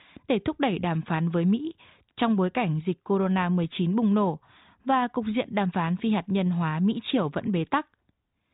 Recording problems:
high frequencies cut off; severe; nothing above 4 kHz

